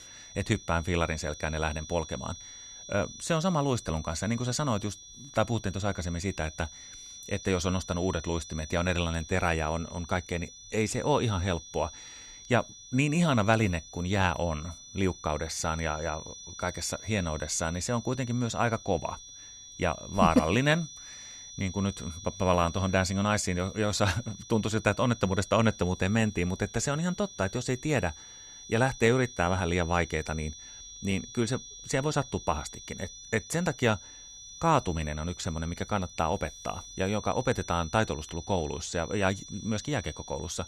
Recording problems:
high-pitched whine; noticeable; throughout; 6 kHz, 15 dB below the speech

